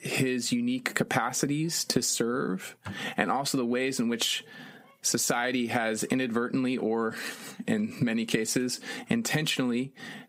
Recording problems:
squashed, flat; somewhat

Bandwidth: 15.5 kHz